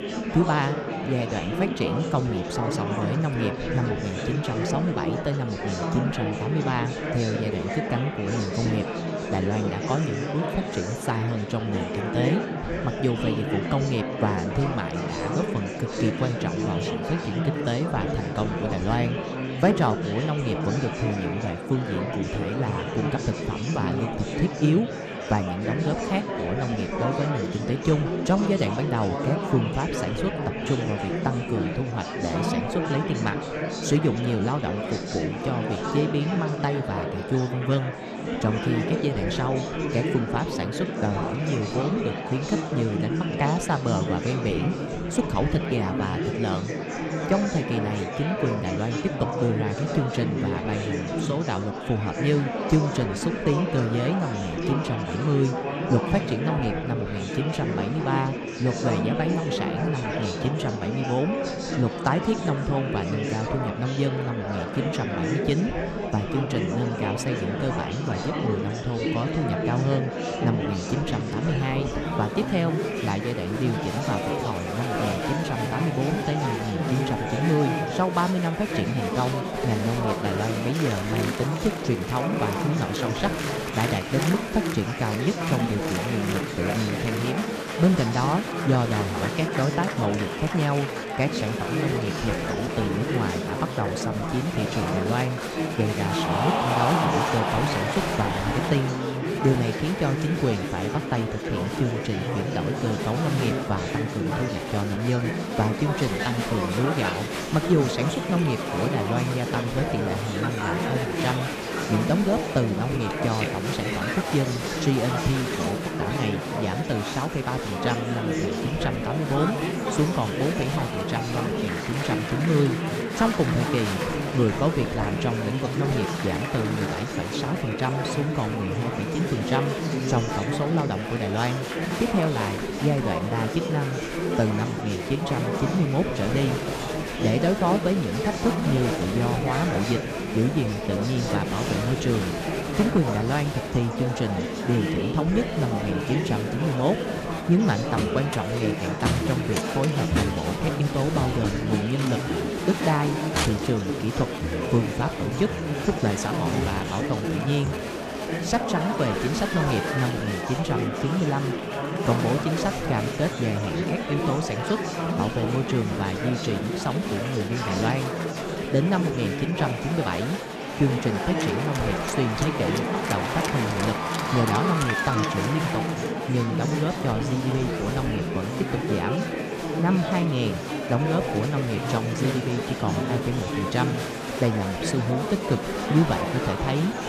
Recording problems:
murmuring crowd; loud; throughout; 1 dB below the speech

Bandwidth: 14.5 kHz